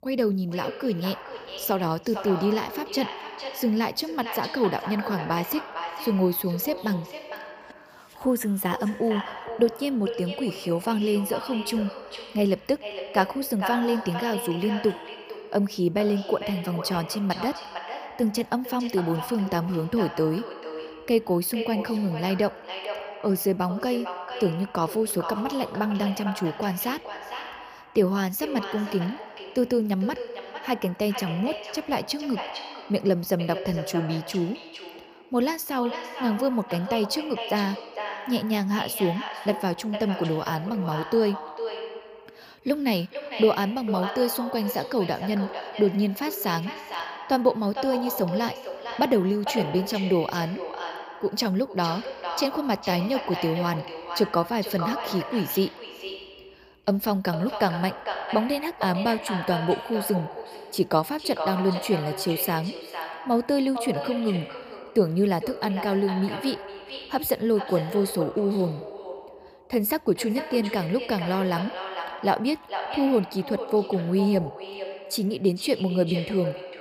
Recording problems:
echo of what is said; strong; throughout; 450 ms later, 9 dB below the speech

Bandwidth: 15 kHz